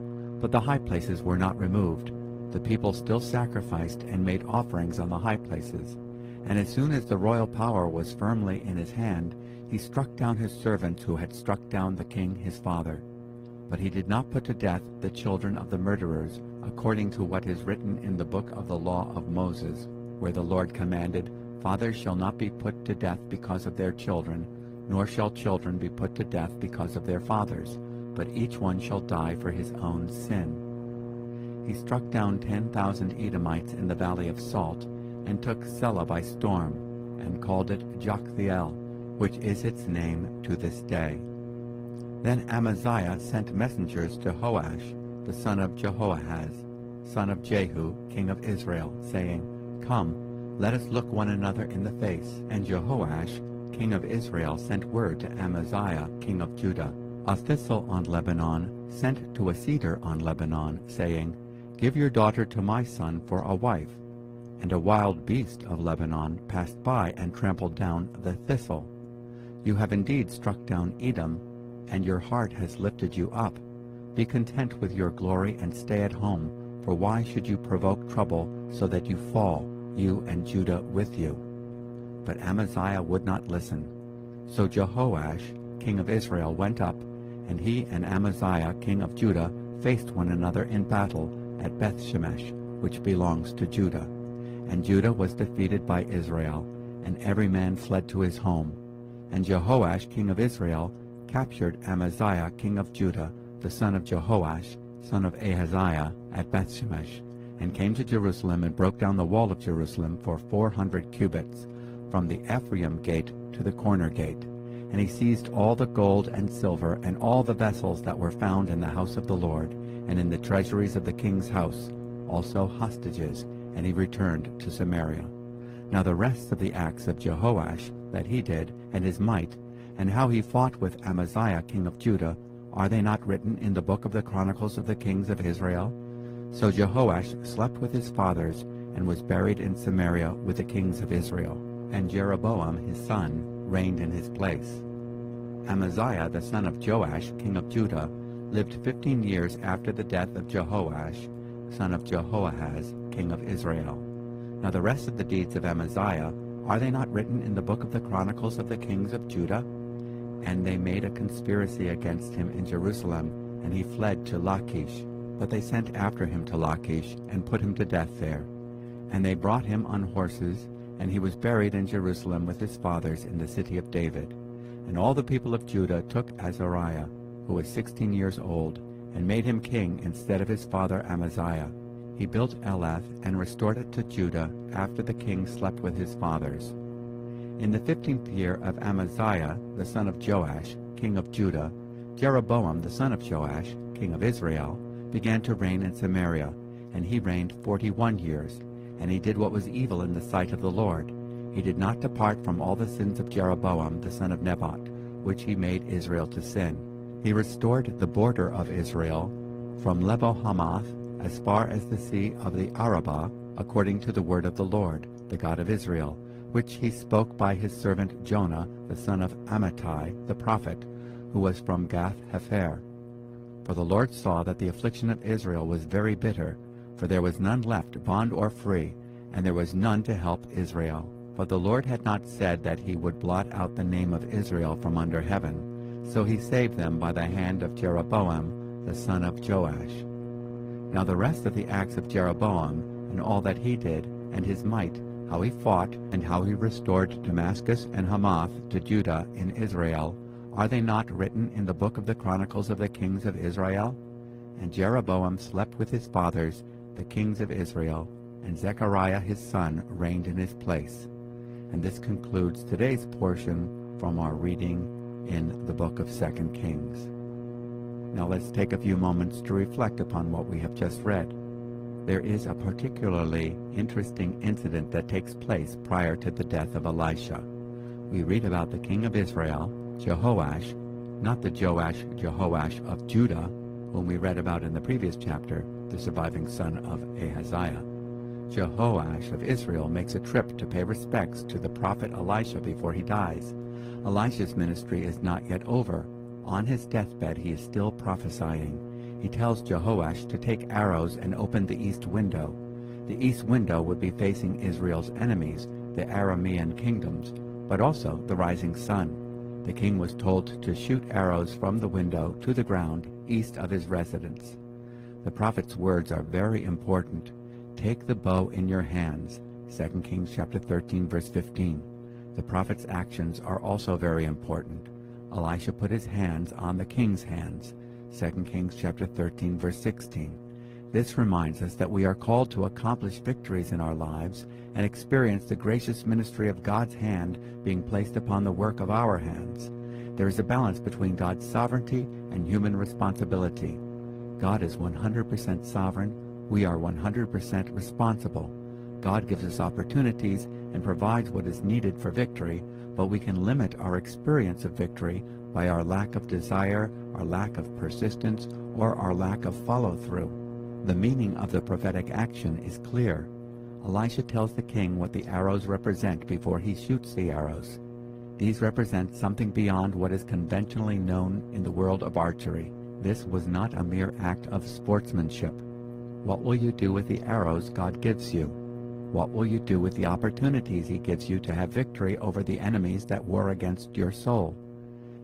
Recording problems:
garbled, watery; slightly; nothing above 15.5 kHz
electrical hum; noticeable; throughout; 60 Hz, 10 dB below the speech

